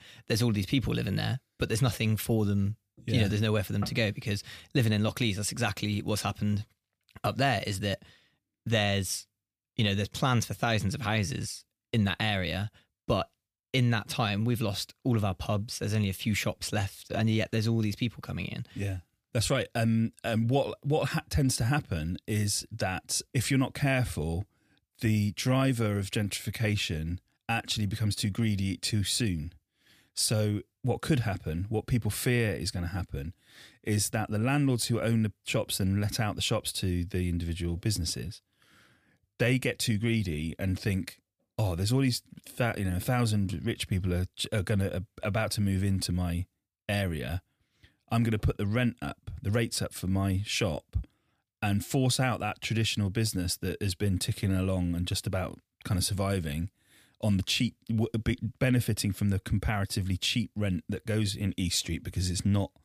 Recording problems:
none

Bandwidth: 15 kHz